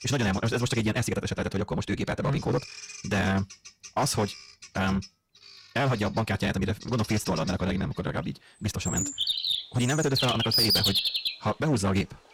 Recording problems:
wrong speed, natural pitch; too fast; 1.8 times normal speed
distortion; slight; 7% of the sound clipped
animal sounds; very loud; throughout; 2 dB above the speech

